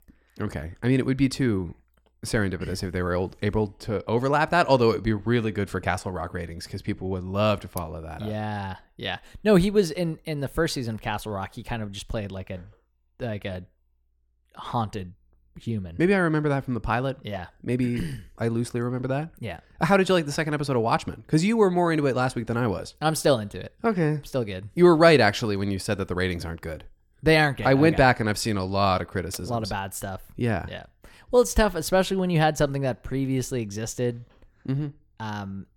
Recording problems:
none

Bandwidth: 17 kHz